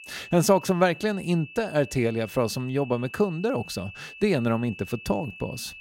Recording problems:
high-pitched whine; noticeable; throughout; 2.5 kHz, 15 dB below the speech

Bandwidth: 16 kHz